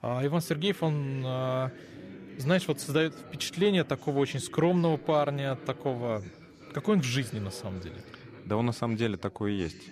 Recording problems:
background chatter; noticeable; throughout; 4 voices, 15 dB below the speech

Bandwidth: 14.5 kHz